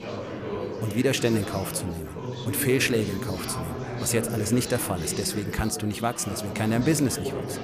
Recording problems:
chatter from many people; loud; throughout; 6 dB below the speech

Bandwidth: 15 kHz